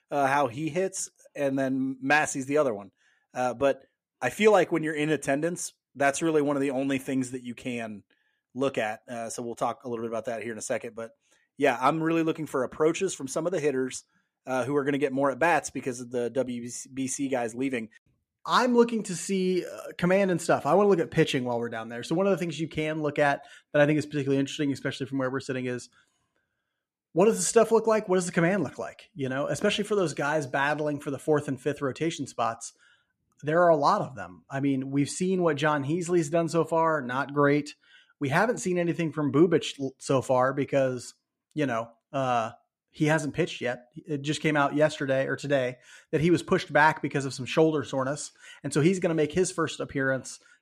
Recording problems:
none

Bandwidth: 14.5 kHz